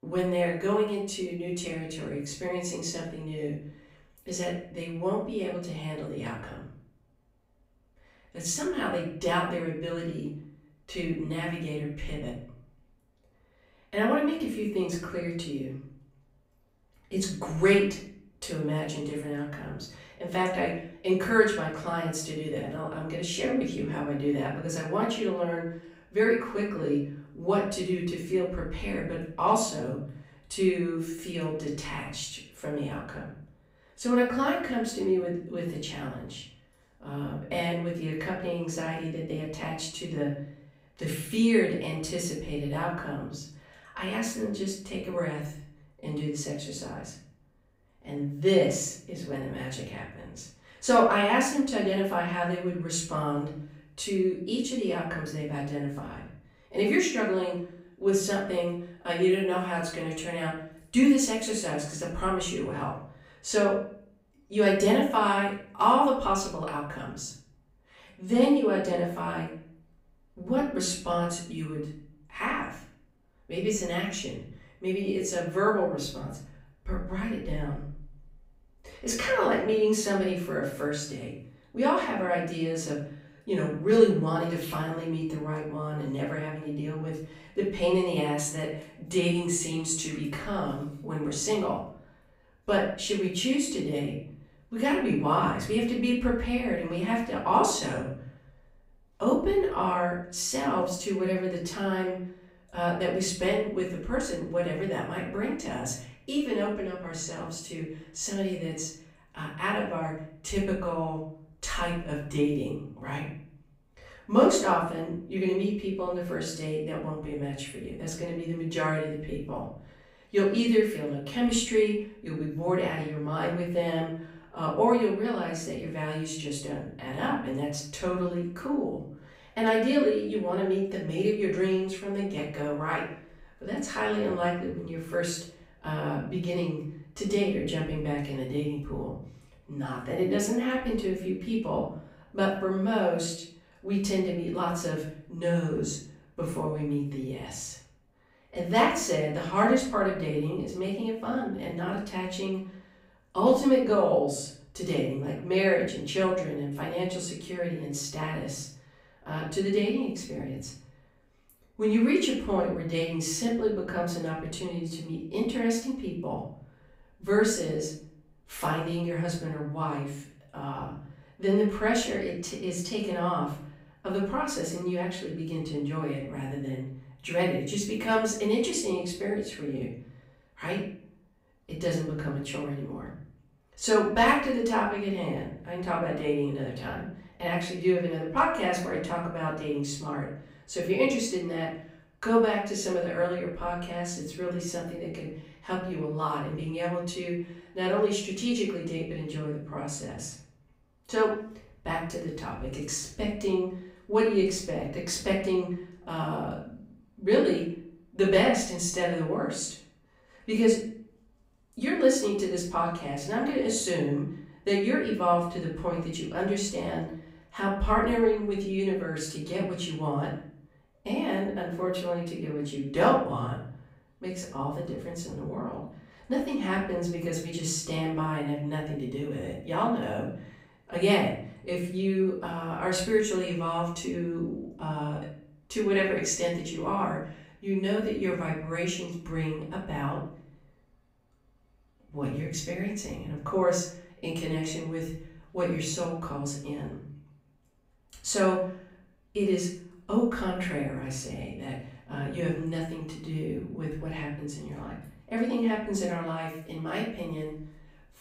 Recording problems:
off-mic speech; far
room echo; noticeable; dies away in 0.5 s

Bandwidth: 15.5 kHz